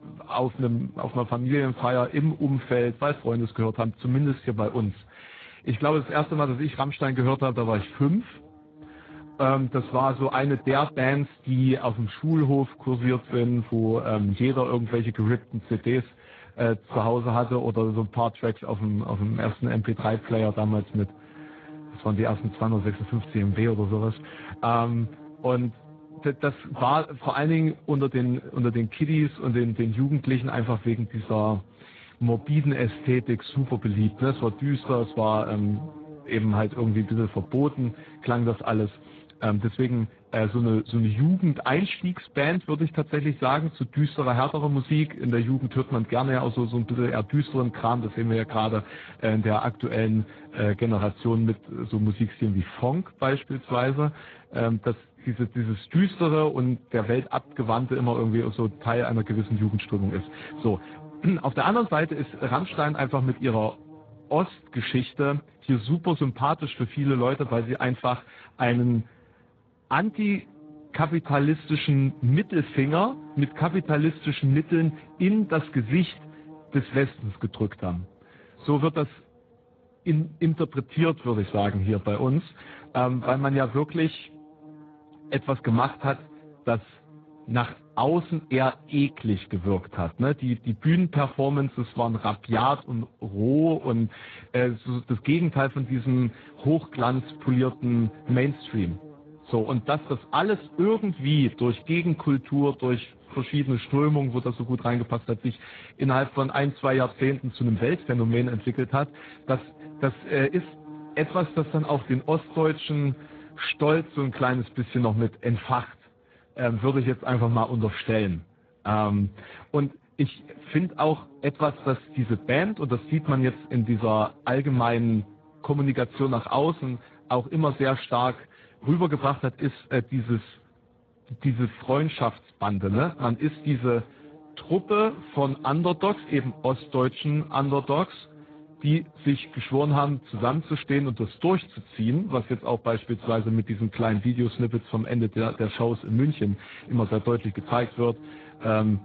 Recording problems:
garbled, watery; badly; nothing above 4 kHz
electrical hum; faint; throughout; 60 Hz, 25 dB below the speech

